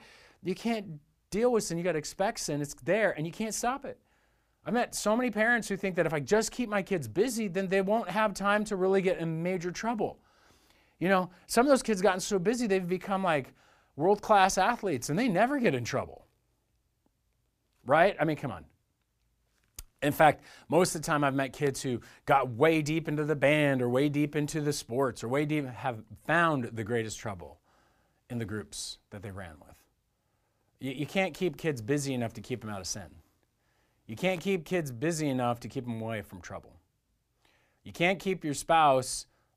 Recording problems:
none

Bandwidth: 15 kHz